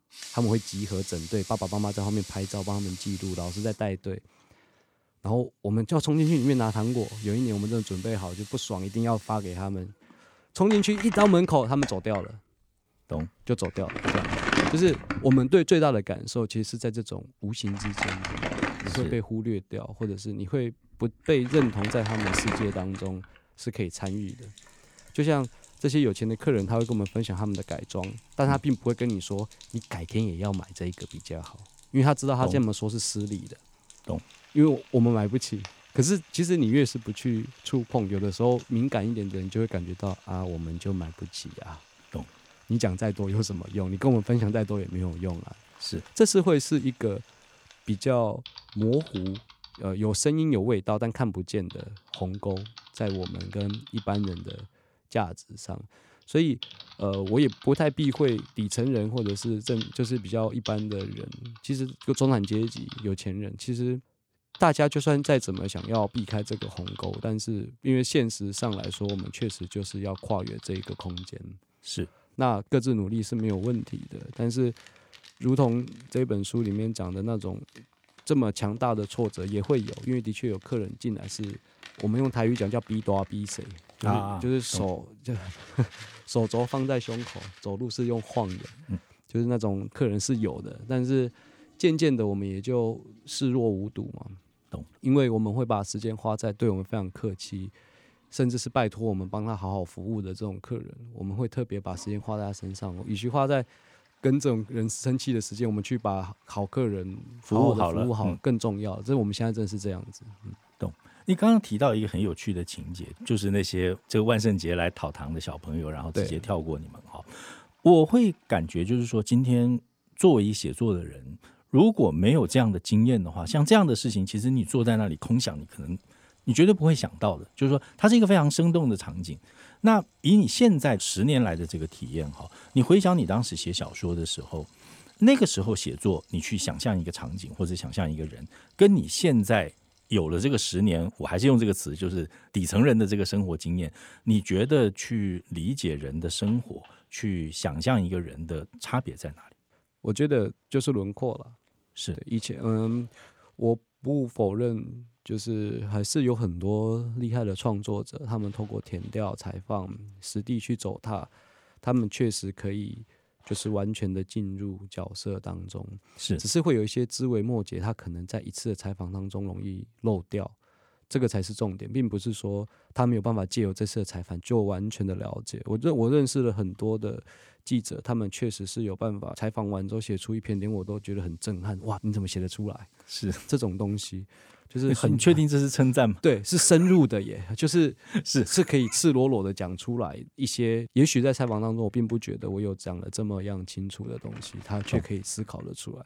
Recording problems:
household noises; noticeable; throughout; 15 dB below the speech

